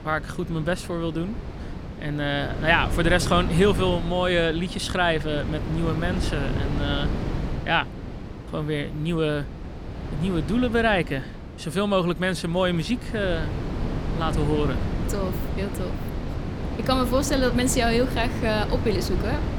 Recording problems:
wind noise on the microphone; occasional gusts; 10 dB below the speech

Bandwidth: 18.5 kHz